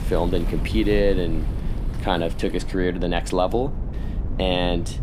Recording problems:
wind noise on the microphone; occasional gusts; 15 dB below the speech
rain or running water; faint; throughout; 20 dB below the speech

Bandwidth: 15.5 kHz